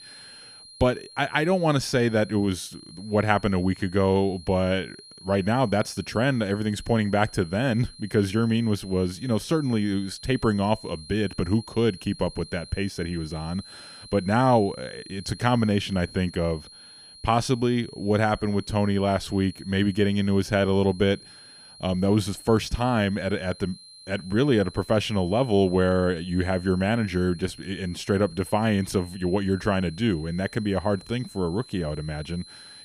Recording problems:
high-pitched whine; noticeable; throughout; 4 kHz, 20 dB below the speech

